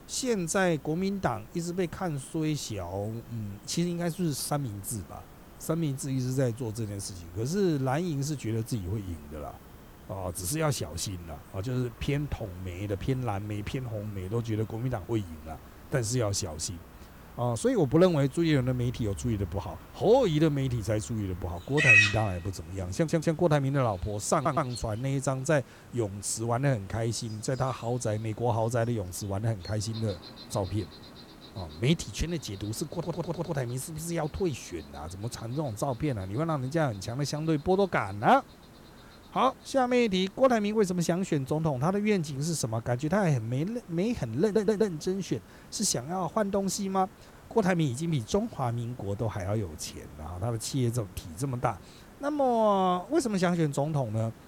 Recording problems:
animal sounds; very loud; throughout; 1 dB above the speech
hiss; faint; throughout; 25 dB below the speech
audio stuttering; 4 times, first at 23 s

